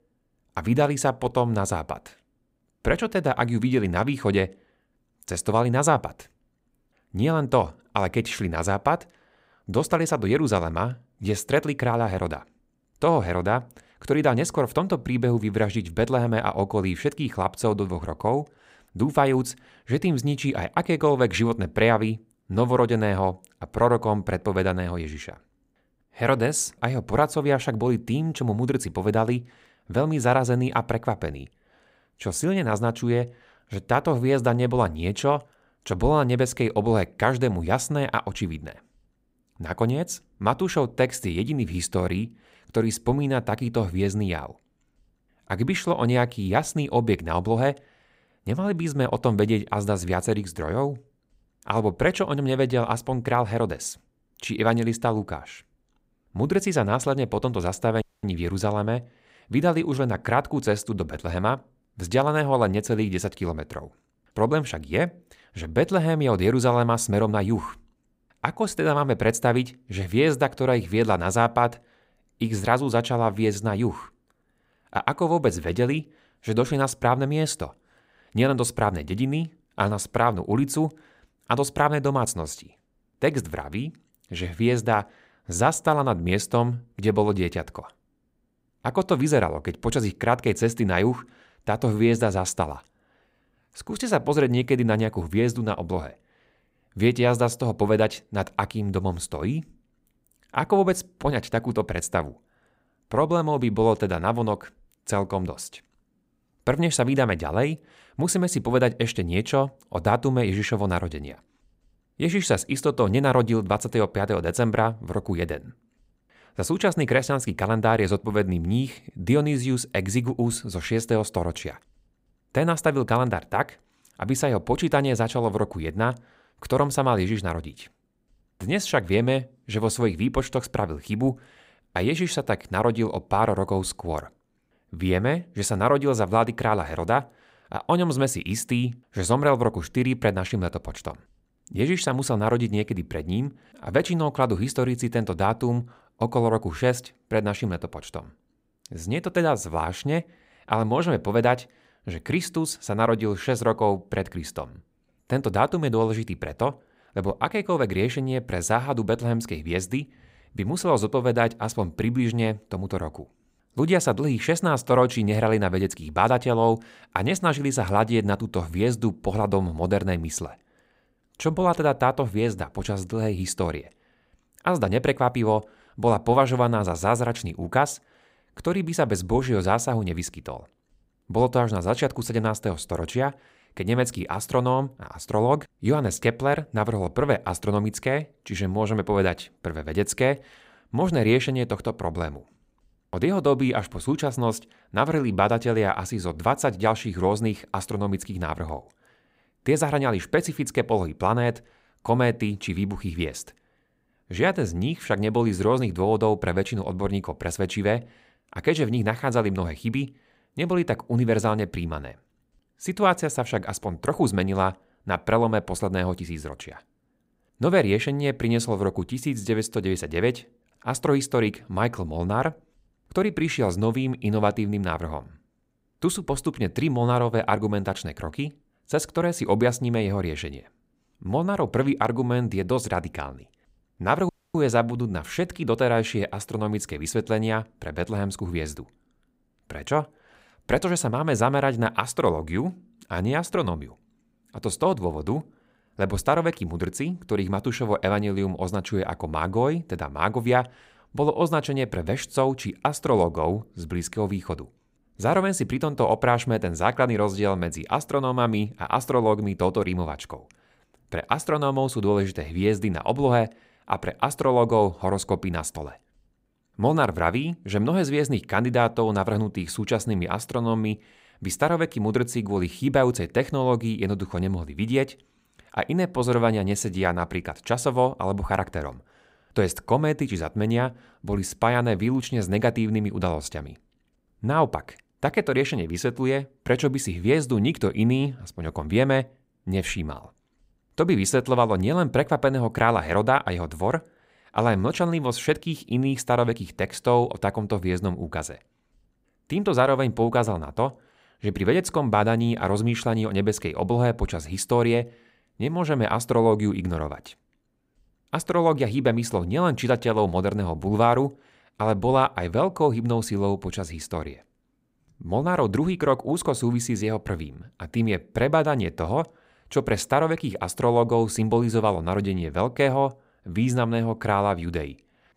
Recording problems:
audio cutting out; at 58 s and at 3:54

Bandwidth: 15.5 kHz